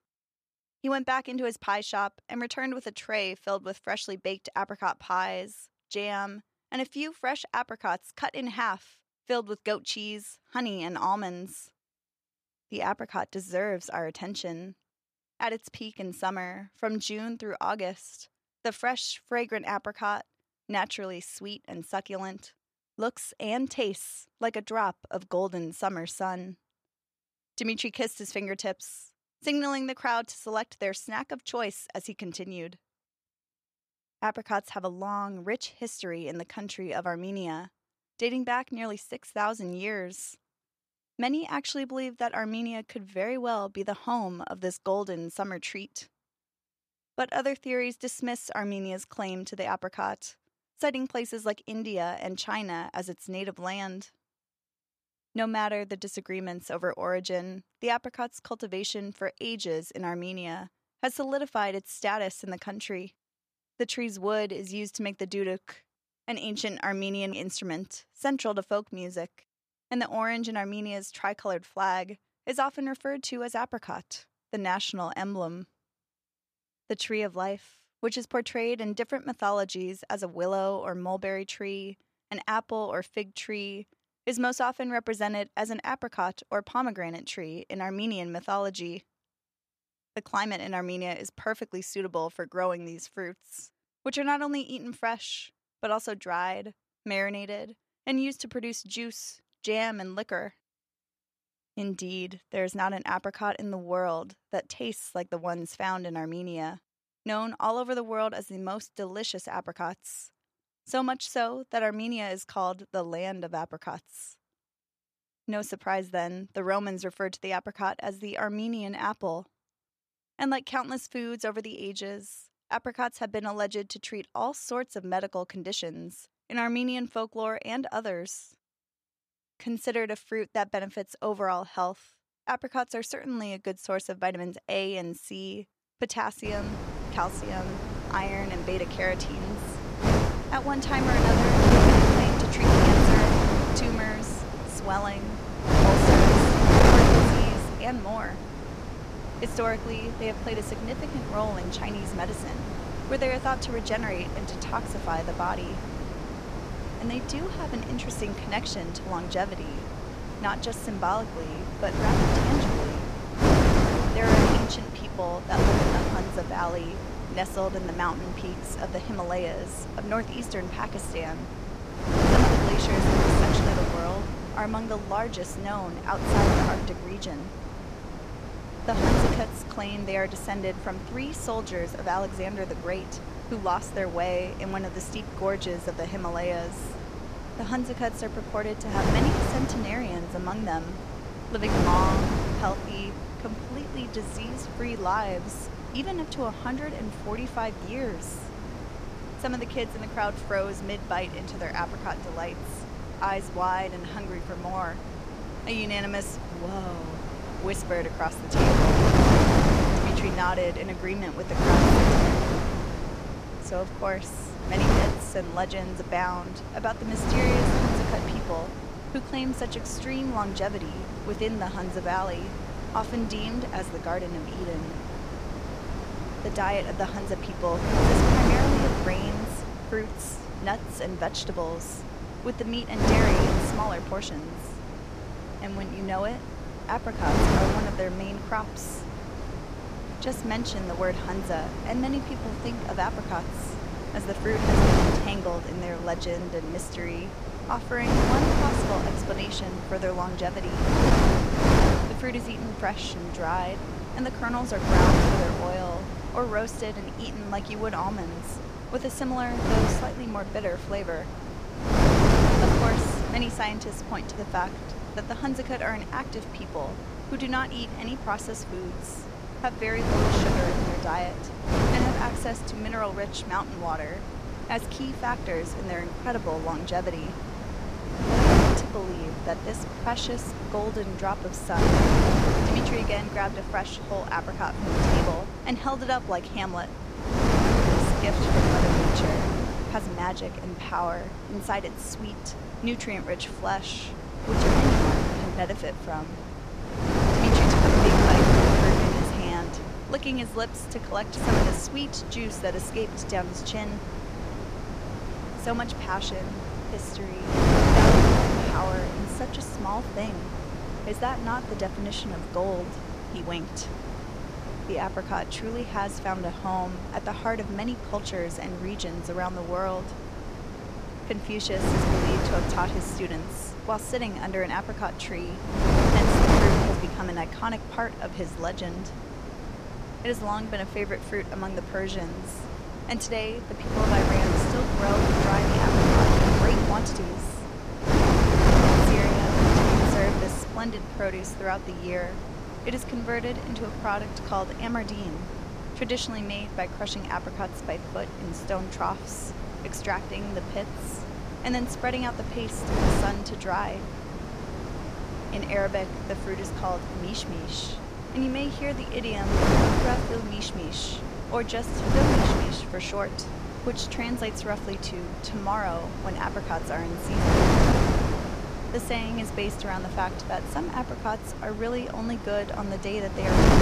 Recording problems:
wind noise on the microphone; heavy; from 2:16 on; 2 dB above the speech

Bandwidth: 14.5 kHz